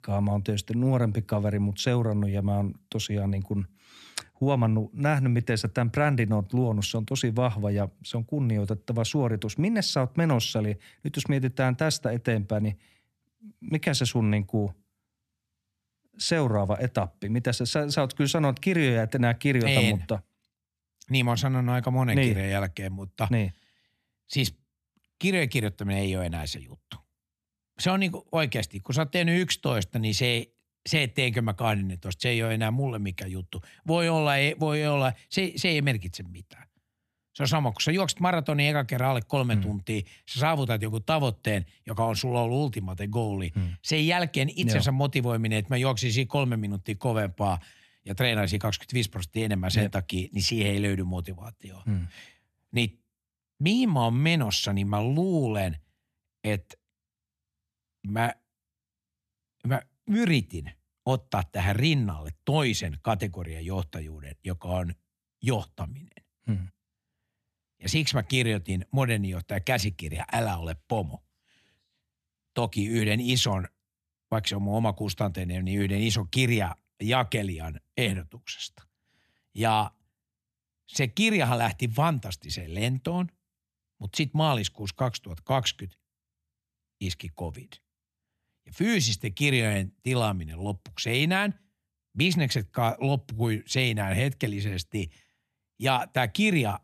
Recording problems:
none

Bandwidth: 13.5 kHz